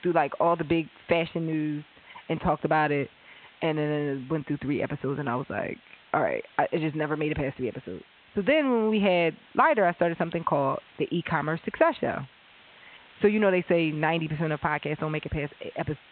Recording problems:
high frequencies cut off; severe; nothing above 3.5 kHz
hiss; faint; throughout; 25 dB below the speech

